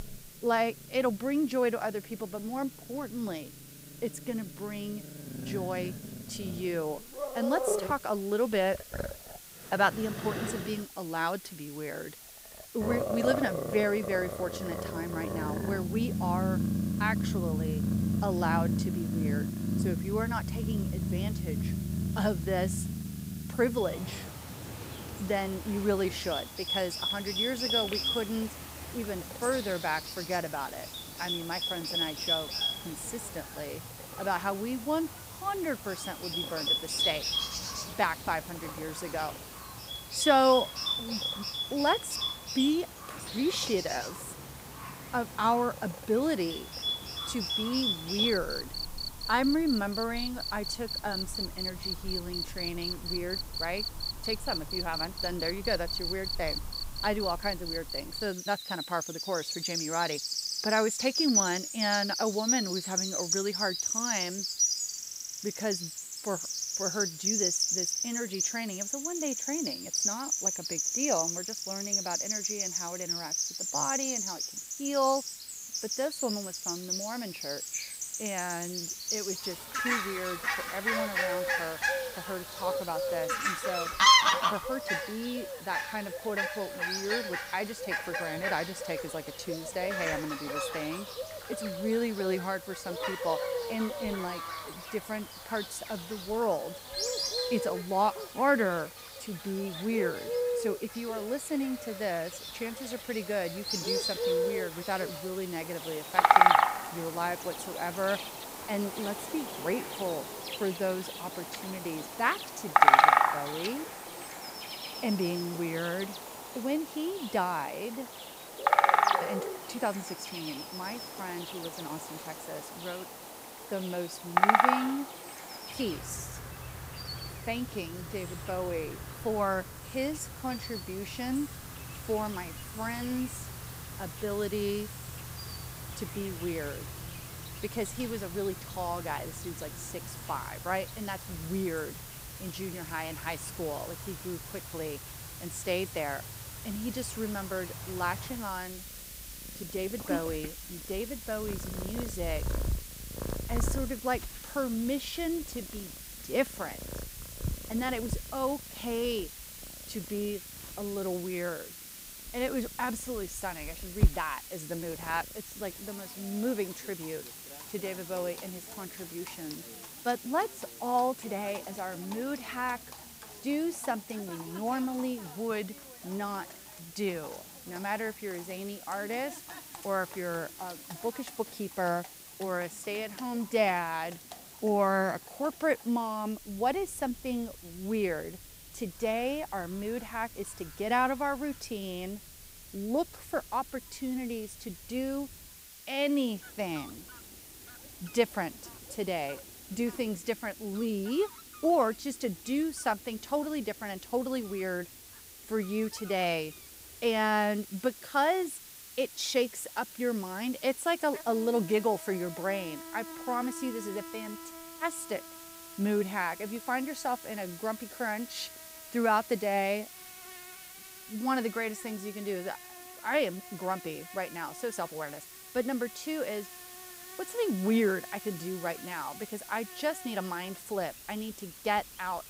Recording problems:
animal sounds; very loud; throughout; 1 dB above the speech
hiss; noticeable; throughout; 10 dB below the speech

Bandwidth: 15.5 kHz